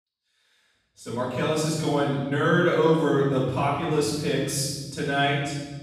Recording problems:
room echo; strong; dies away in 1.5 s
off-mic speech; far

